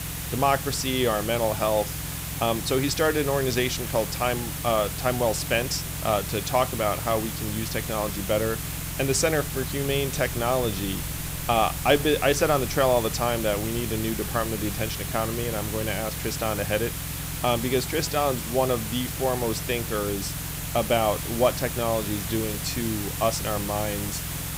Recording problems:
hiss; loud; throughout; 6 dB below the speech
low rumble; faint; throughout; 20 dB below the speech

